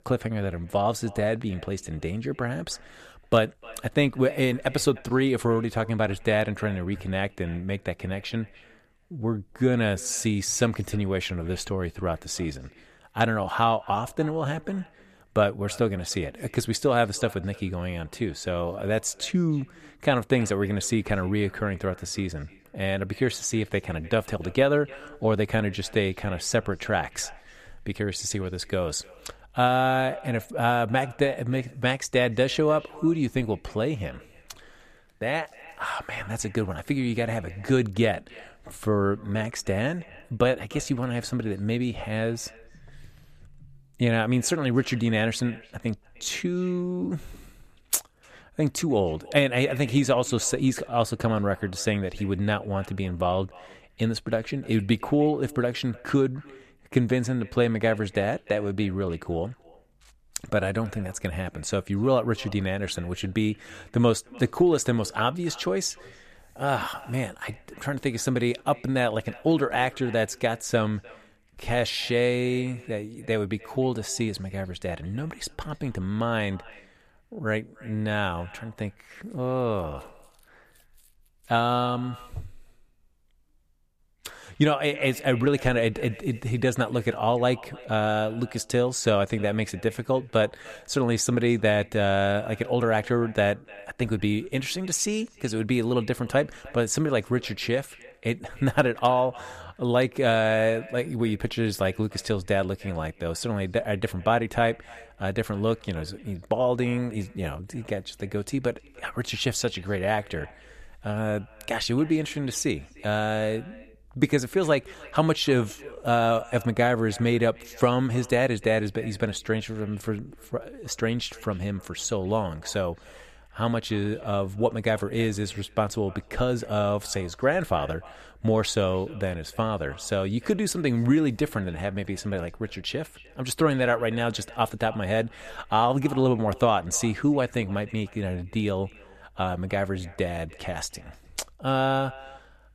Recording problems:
echo of what is said; faint; throughout; 300 ms later, 25 dB below the speech

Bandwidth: 14.5 kHz